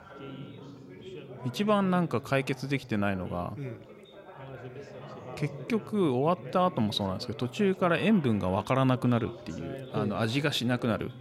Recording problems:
background chatter; noticeable; throughout; 4 voices, 15 dB below the speech

